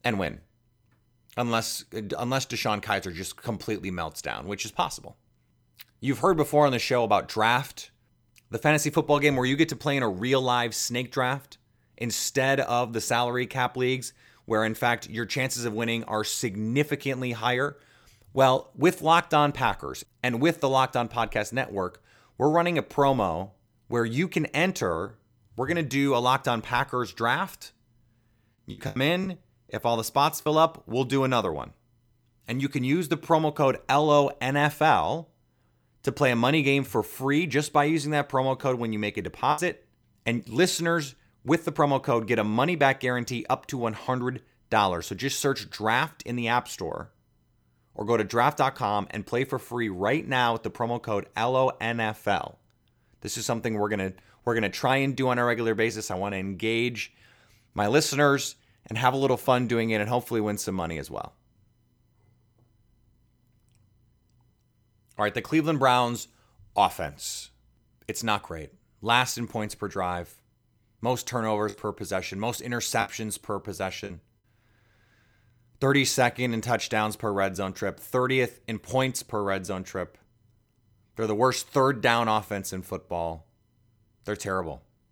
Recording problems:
choppy; very; from 29 to 30 s, at 40 s and from 1:12 to 1:14; 7% of the speech affected

